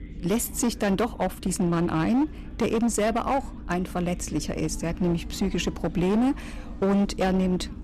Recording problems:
distortion; slight; 12% of the sound clipped
low rumble; noticeable; throughout; 20 dB below the speech
chatter from many people; faint; throughout; 25 dB below the speech

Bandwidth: 13.5 kHz